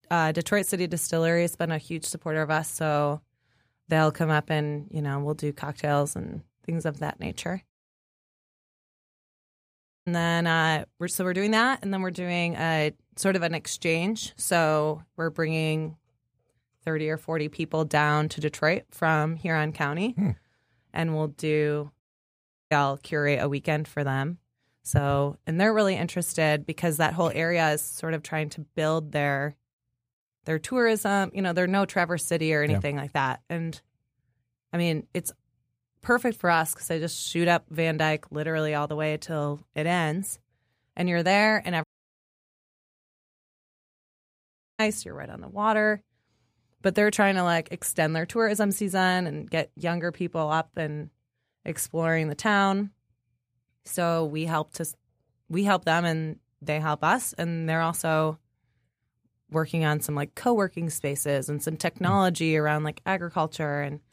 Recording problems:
audio cutting out; at 7.5 s for 2.5 s, at 22 s for 0.5 s and at 42 s for 3 s

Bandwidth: 15 kHz